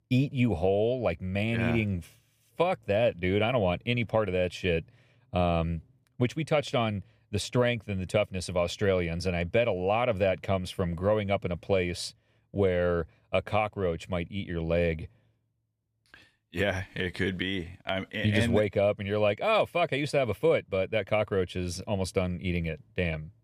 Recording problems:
none

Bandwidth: 15 kHz